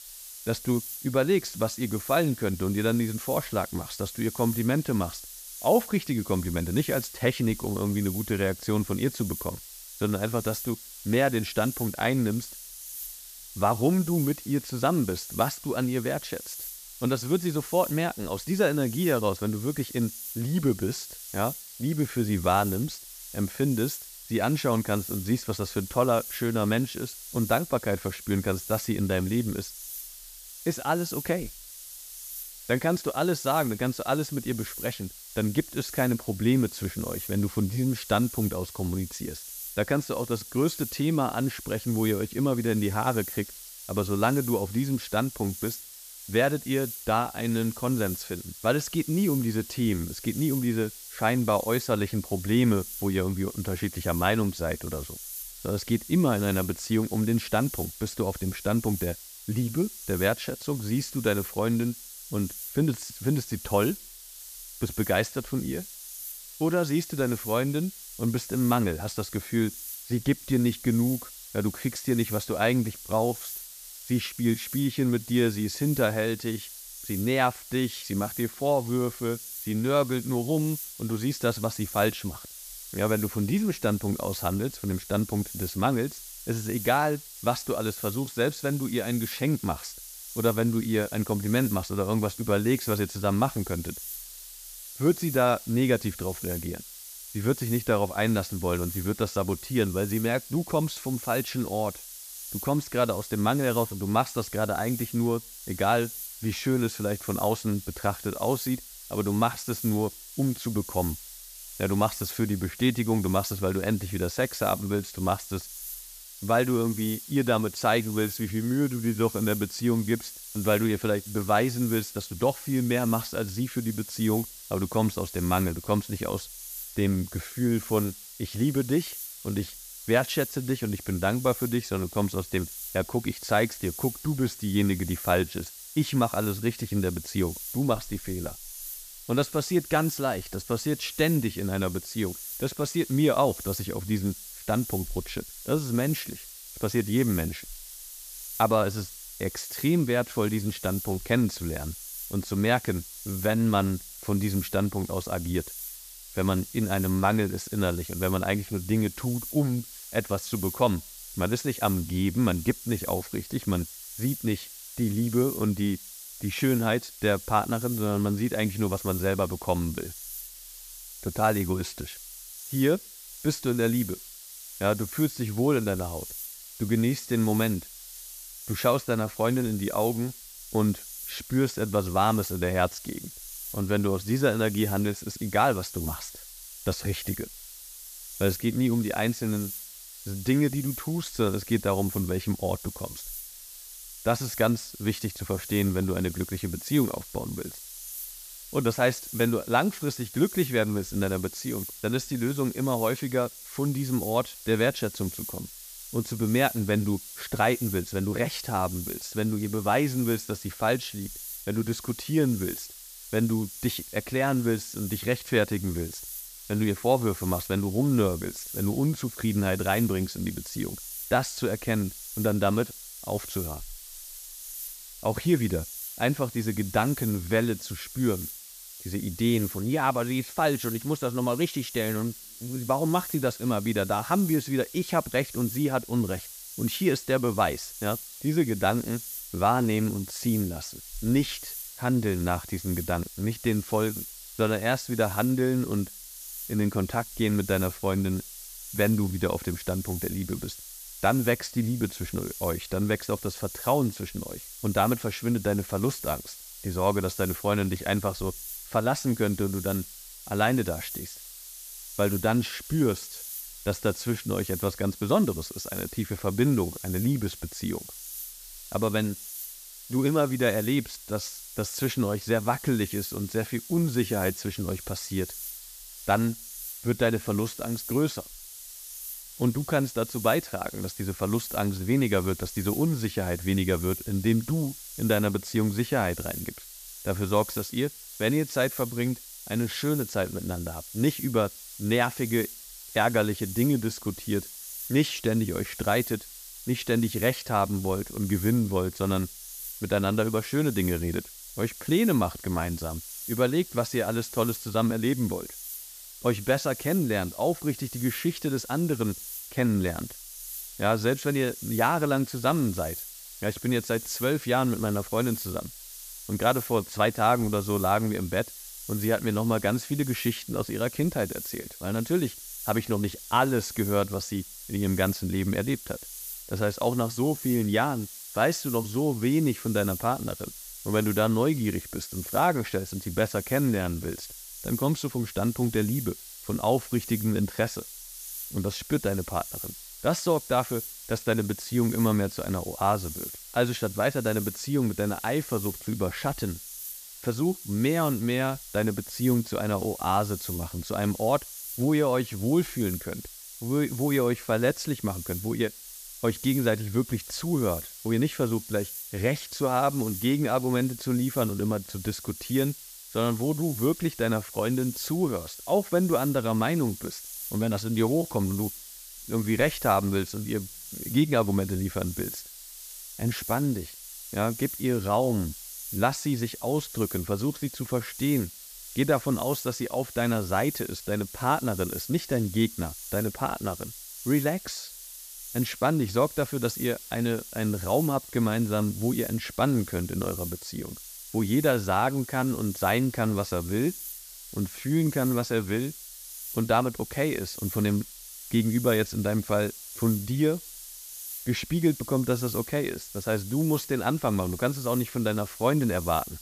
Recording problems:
hiss; noticeable; throughout; 10 dB below the speech

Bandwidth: 14.5 kHz